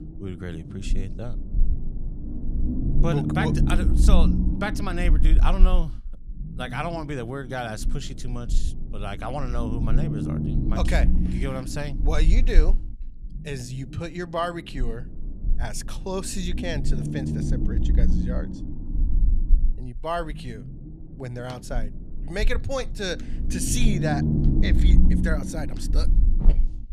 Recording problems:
low rumble; loud; throughout; 6 dB below the speech

